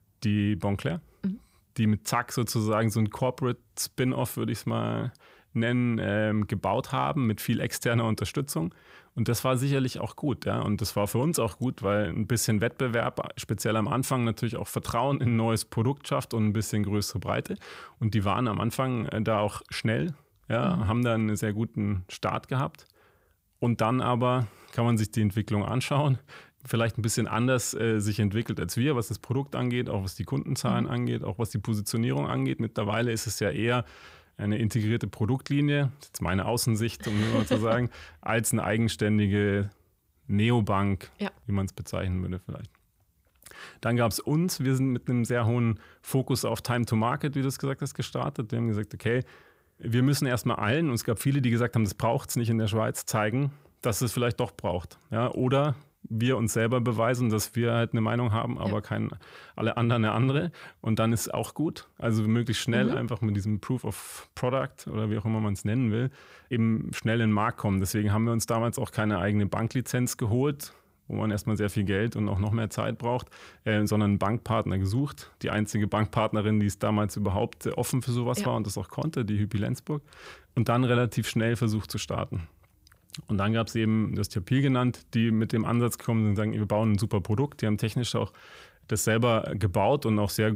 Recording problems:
abrupt cut into speech; at the end

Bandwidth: 15.5 kHz